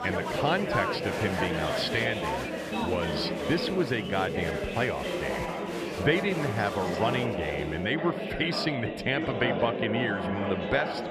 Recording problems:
chatter from many people; loud; throughout; 1 dB below the speech

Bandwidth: 14.5 kHz